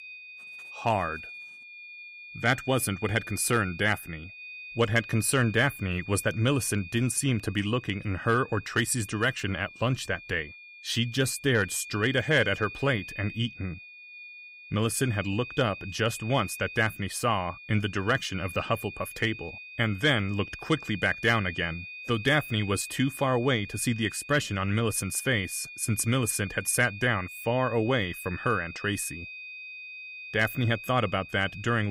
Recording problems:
high-pitched whine; noticeable; throughout; 2.5 kHz, 15 dB below the speech
abrupt cut into speech; at the end

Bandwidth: 15.5 kHz